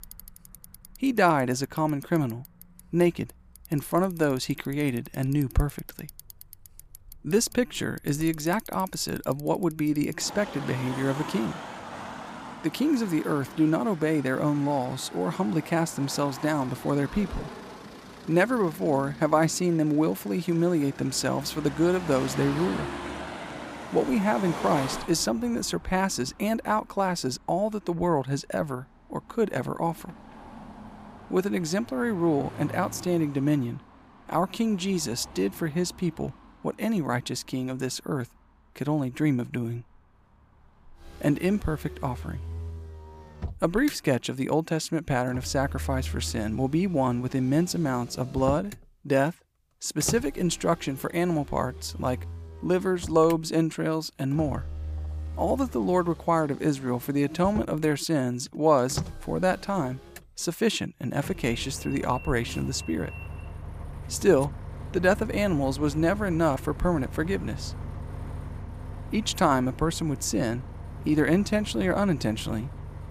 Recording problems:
traffic noise; noticeable; throughout; 15 dB below the speech

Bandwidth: 15 kHz